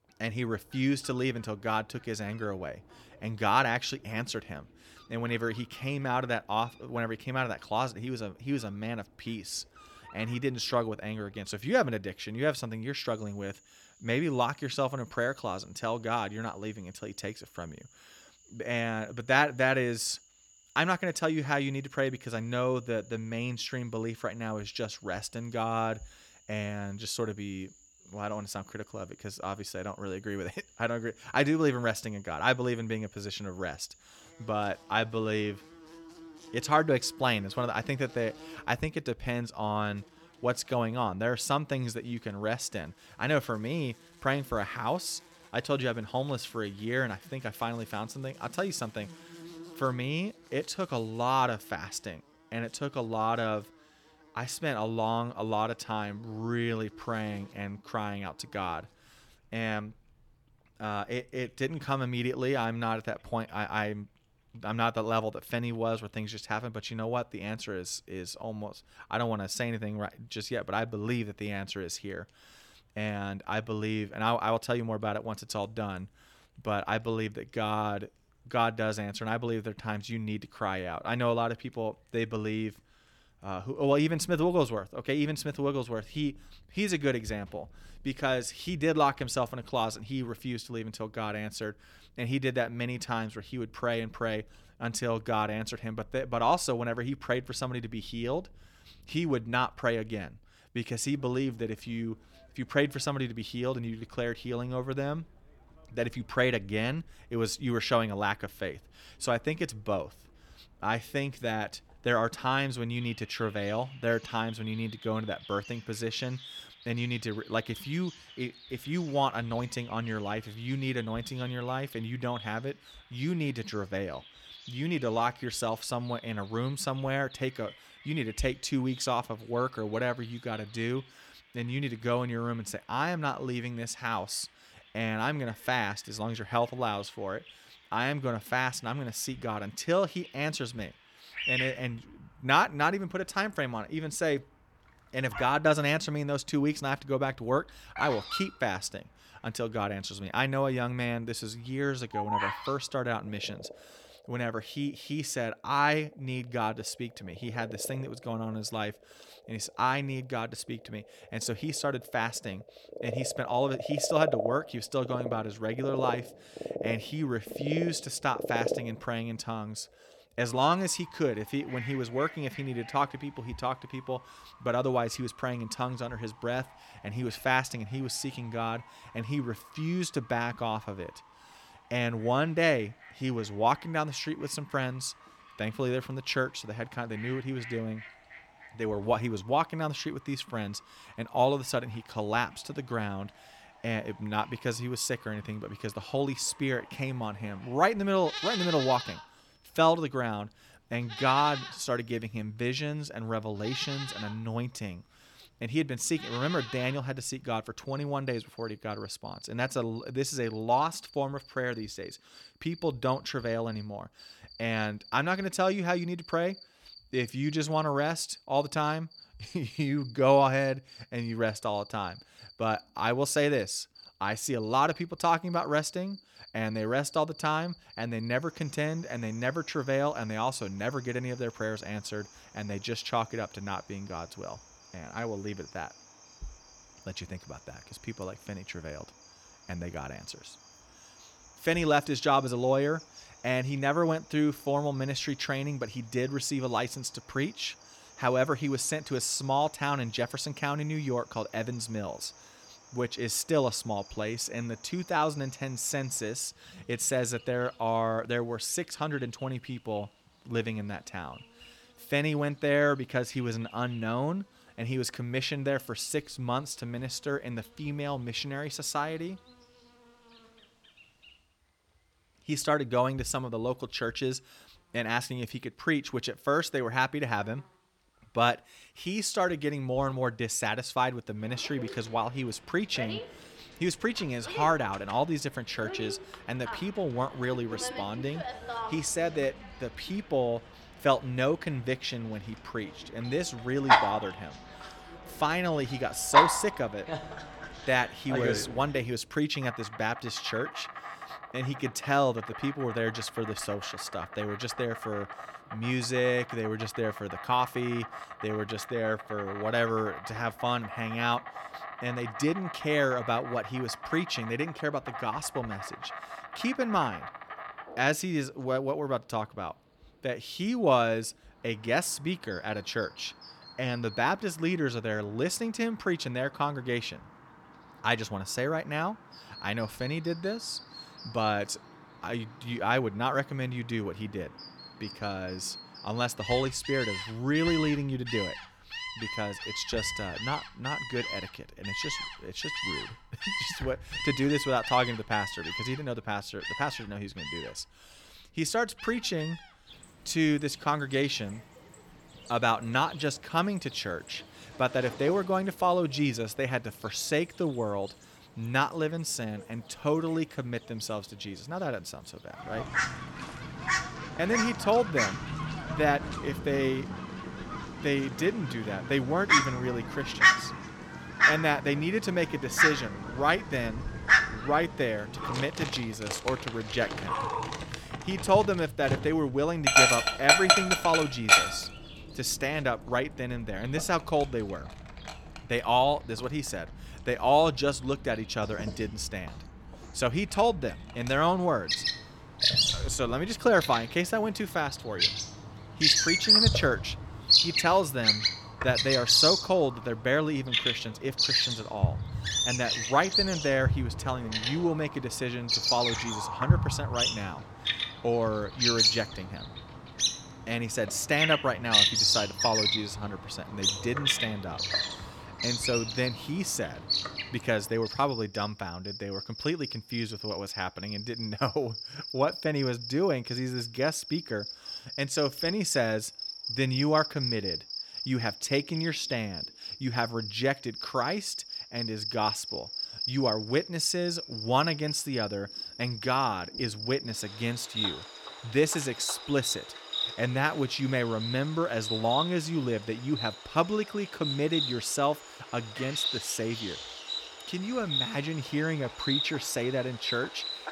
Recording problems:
animal sounds; very loud; throughout; as loud as the speech

